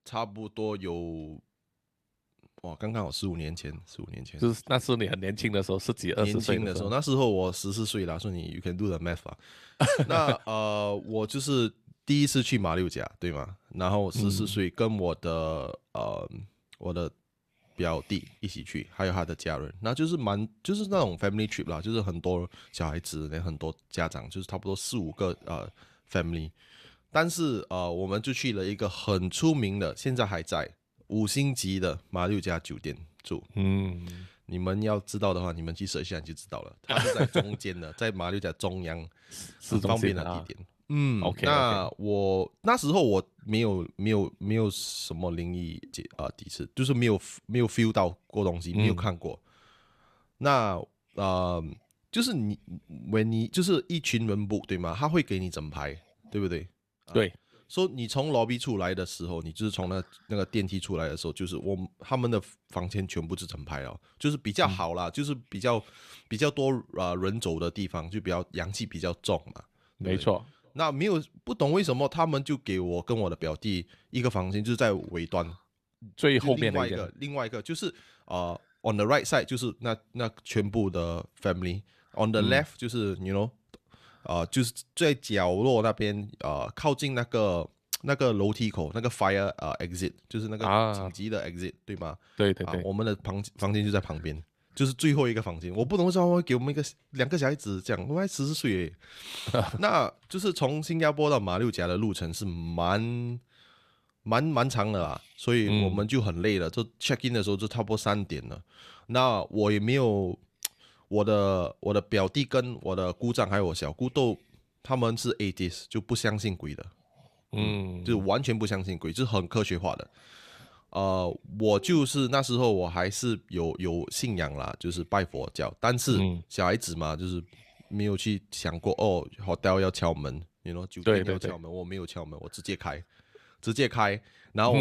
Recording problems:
abrupt cut into speech; at the end

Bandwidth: 14.5 kHz